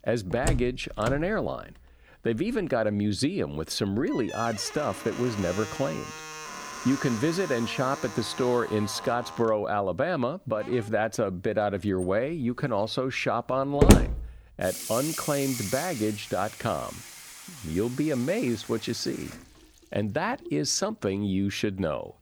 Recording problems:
household noises; loud; throughout; 4 dB below the speech

